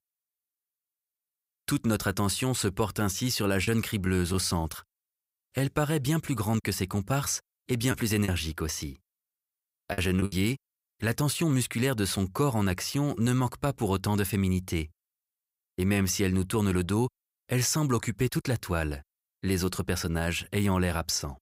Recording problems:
choppy; very; from 8 to 10 s; 8% of the speech affected

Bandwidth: 15.5 kHz